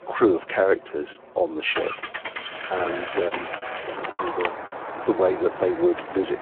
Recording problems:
phone-call audio; poor line
traffic noise; loud; throughout; 8 dB below the speech
animal sounds; noticeable; until 4 s; 15 dB below the speech
choppy; occasionally; 3% of the speech affected

